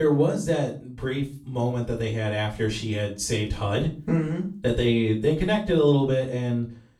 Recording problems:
off-mic speech; far
room echo; slight; dies away in 0.3 s
abrupt cut into speech; at the start

